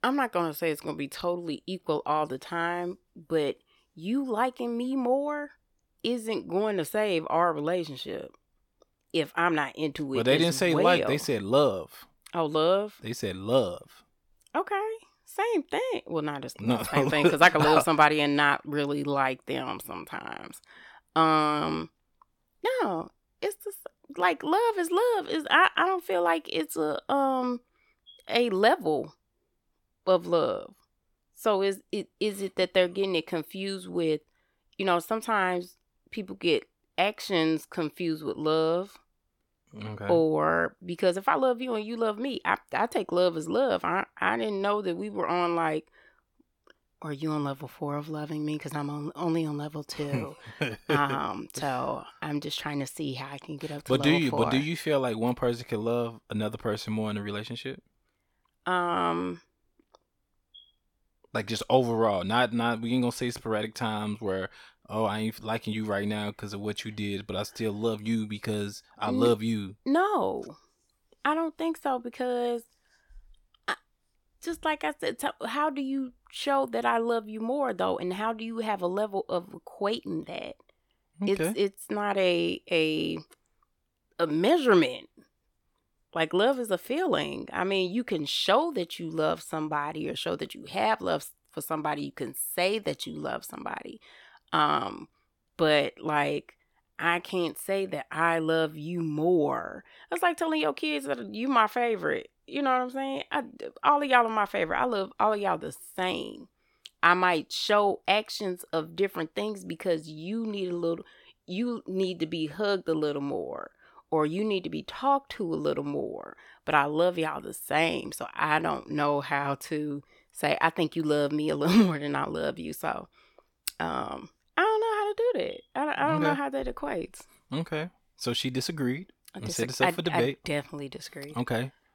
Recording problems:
none

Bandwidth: 17 kHz